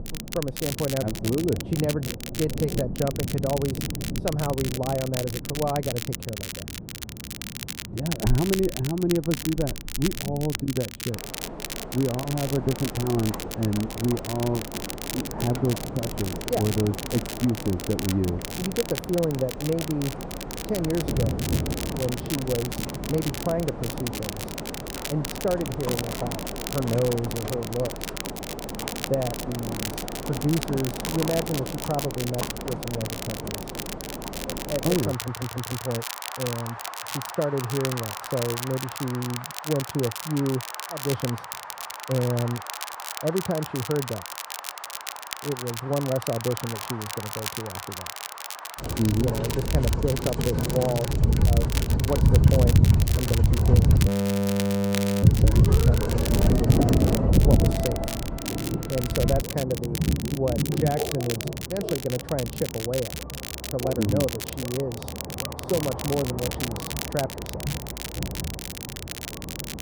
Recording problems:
muffled; very; fading above 1.5 kHz
rain or running water; loud; throughout; as loud as the speech
crackle, like an old record; loud; 6 dB below the speech
audio stuttering; at 35 s
audio freezing; at 54 s for 1 s

